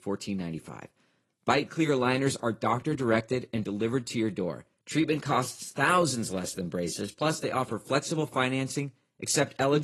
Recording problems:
garbled, watery; slightly; nothing above 11.5 kHz
abrupt cut into speech; at the end

